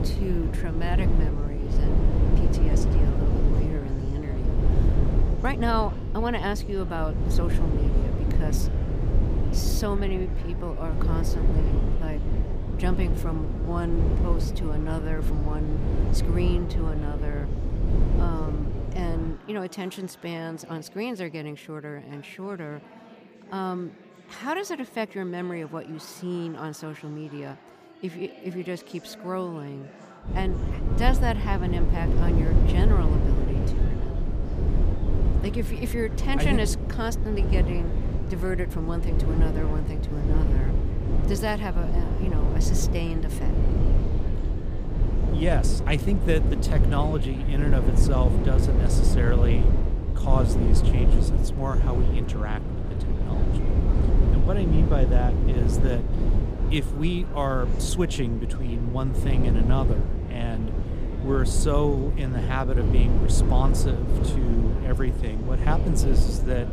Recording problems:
low rumble; loud; until 19 s and from 30 s on; 3 dB below the speech
chatter from many people; noticeable; throughout; 15 dB below the speech

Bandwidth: 15 kHz